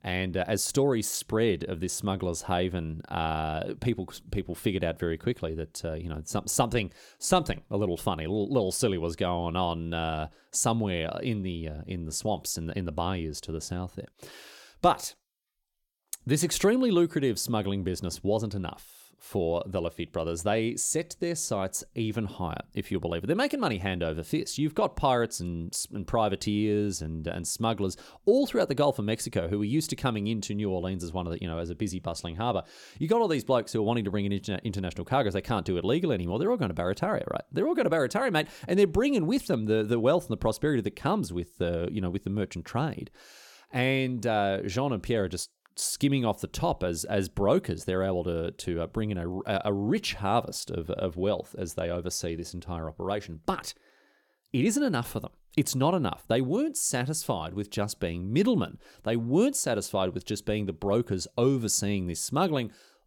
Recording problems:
none

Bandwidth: 17.5 kHz